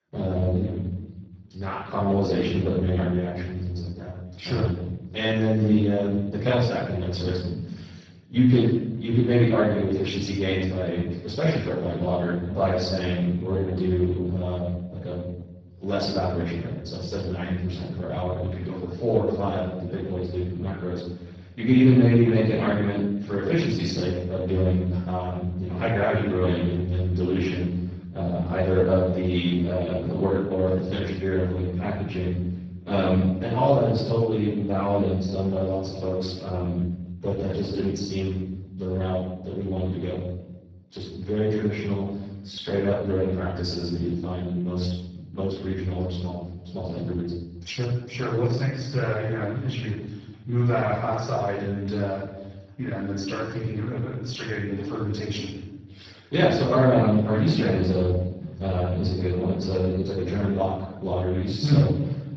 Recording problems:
off-mic speech; far
garbled, watery; badly
room echo; noticeable; dies away in 0.9 s

